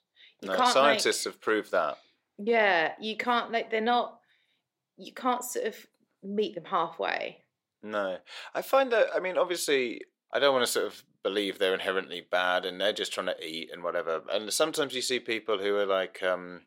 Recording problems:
thin; somewhat; fading below 500 Hz

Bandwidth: 16 kHz